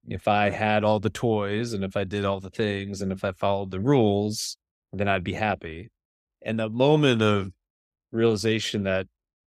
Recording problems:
none

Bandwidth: 15 kHz